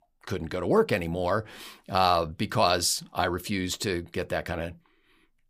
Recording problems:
none

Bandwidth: 15 kHz